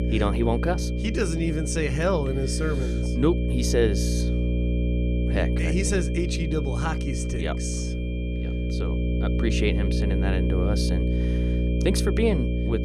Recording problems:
electrical hum; loud; throughout; 60 Hz, 5 dB below the speech
high-pitched whine; noticeable; throughout; 2.5 kHz, 15 dB below the speech

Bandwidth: 14.5 kHz